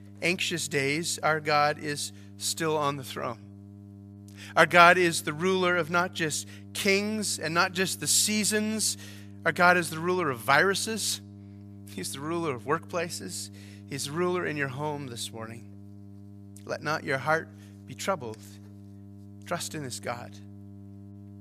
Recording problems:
electrical hum; faint; throughout; 50 Hz, 30 dB below the speech

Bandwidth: 14.5 kHz